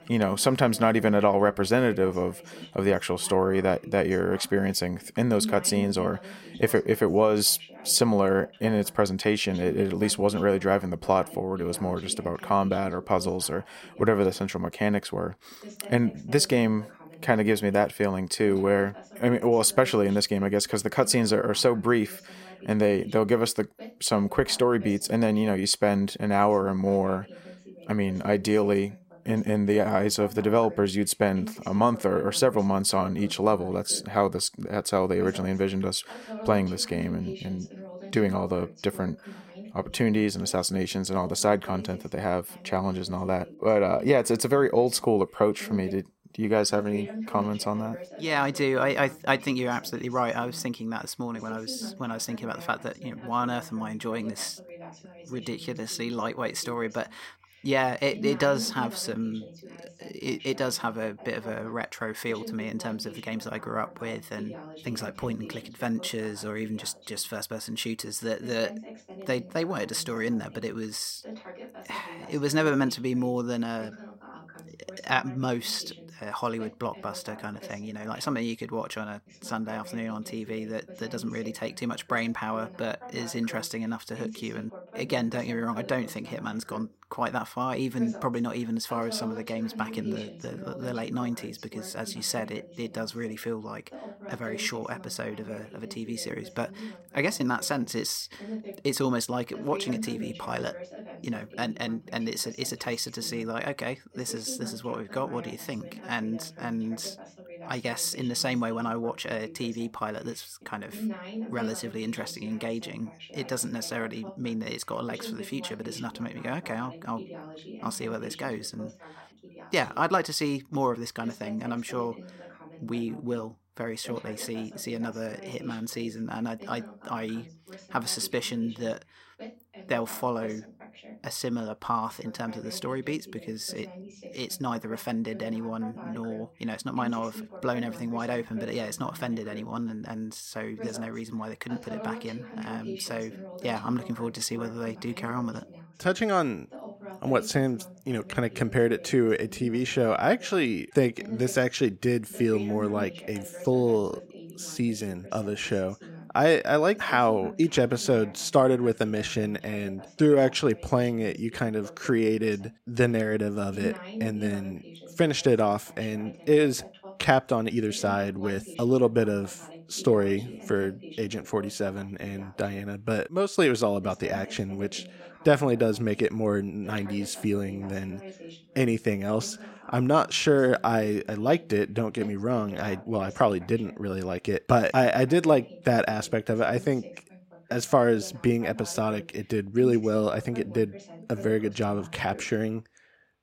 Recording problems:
voice in the background; noticeable; throughout; 15 dB below the speech

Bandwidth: 16 kHz